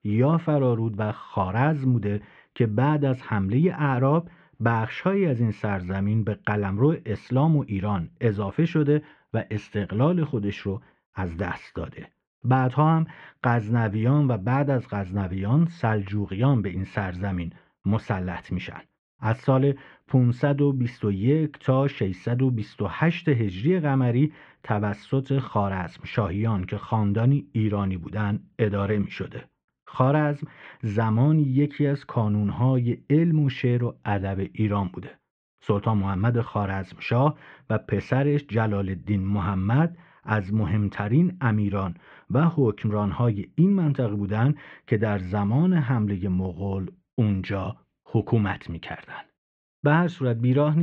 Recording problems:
muffled; very; fading above 2.5 kHz
abrupt cut into speech; at the end

